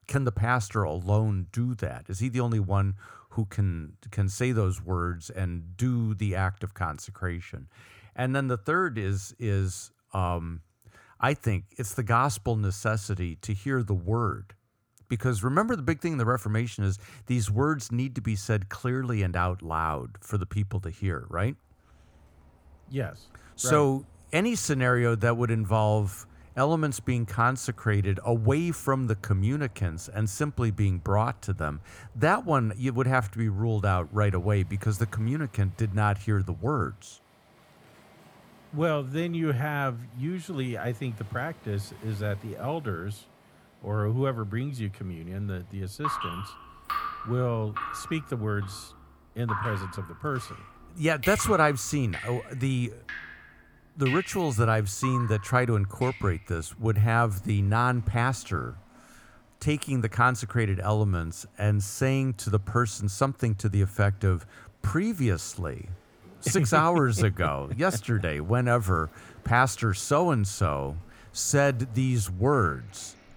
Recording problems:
rain or running water; noticeable; from 22 s on; 15 dB below the speech

